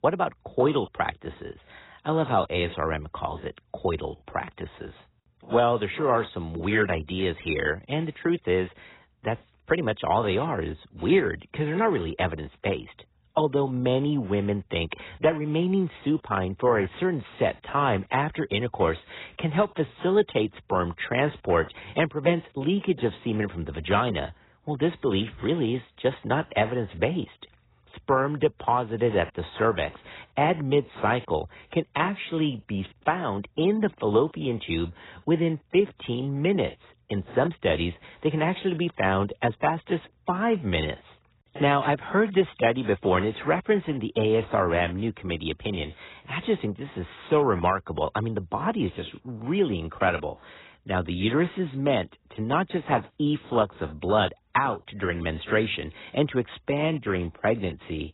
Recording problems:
garbled, watery; badly; nothing above 4 kHz

